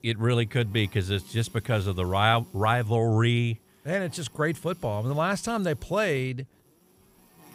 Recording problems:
electrical hum; faint; throughout; 60 Hz, 30 dB below the speech

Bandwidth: 15 kHz